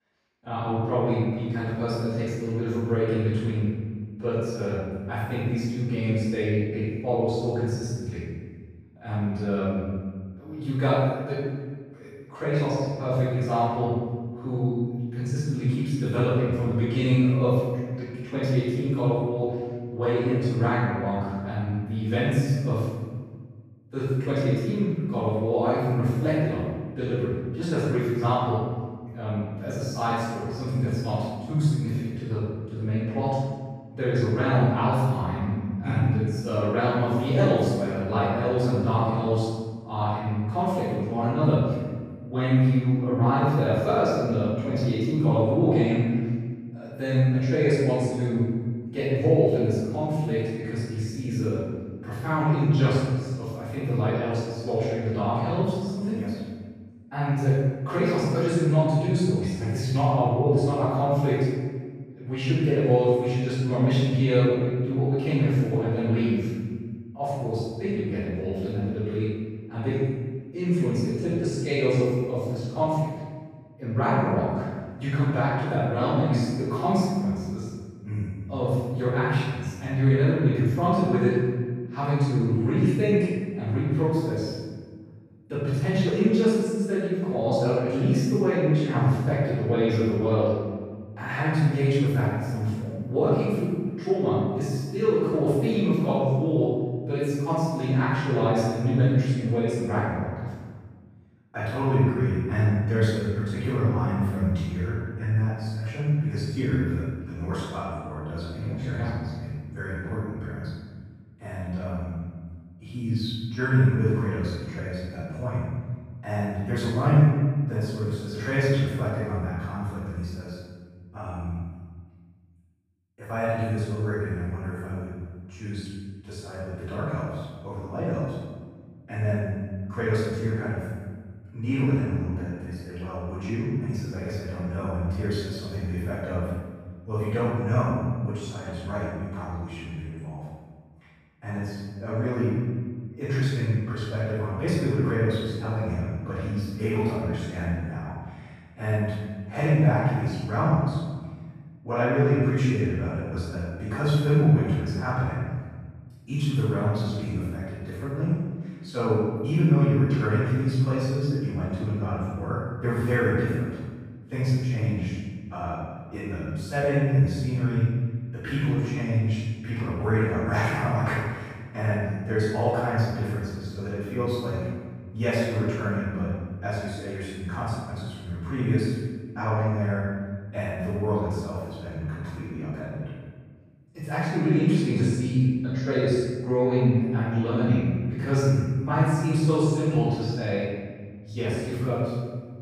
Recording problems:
room echo; strong; dies away in 1.3 s
off-mic speech; far

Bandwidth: 15 kHz